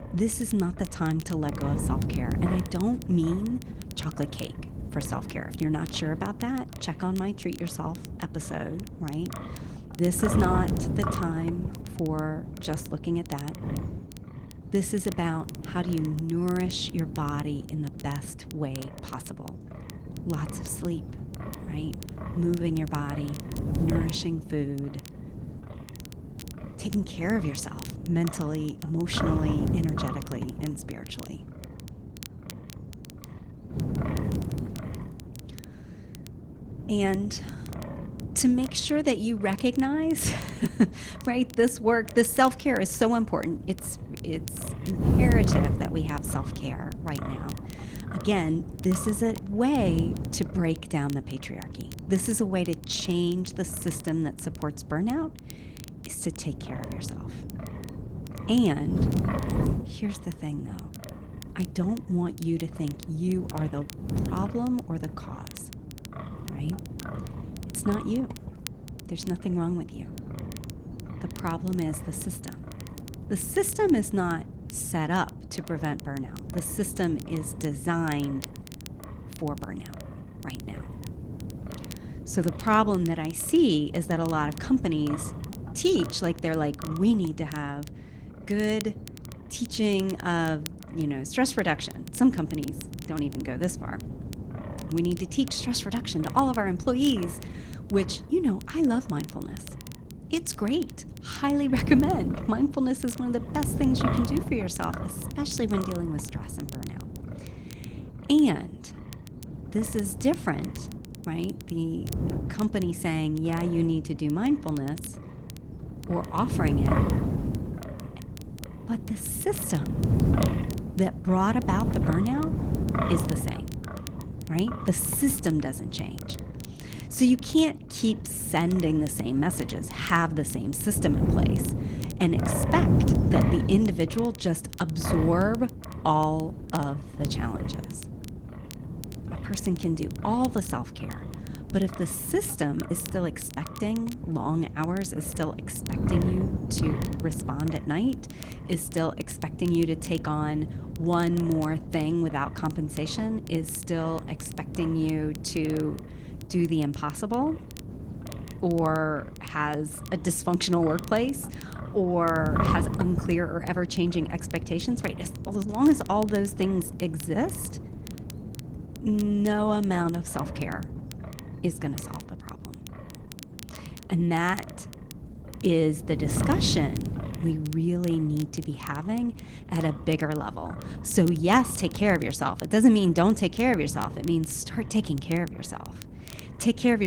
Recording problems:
garbled, watery; slightly
wind noise on the microphone; occasional gusts; 10 dB below the speech
crackle, like an old record; faint; 20 dB below the speech
abrupt cut into speech; at the end

